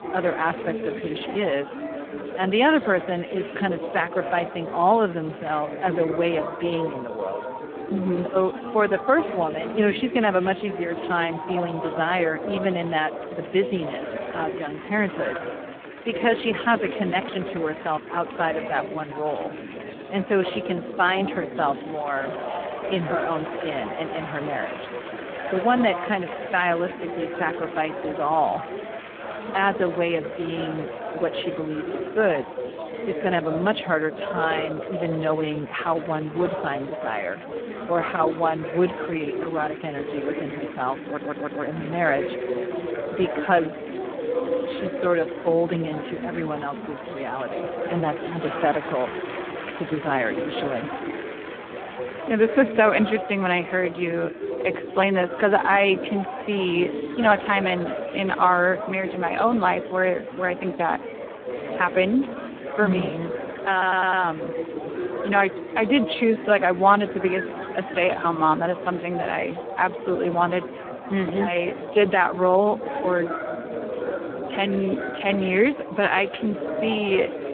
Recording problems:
phone-call audio; poor line
chatter from many people; loud; throughout; 7 dB below the speech
audio stuttering; at 41 s and at 1:04

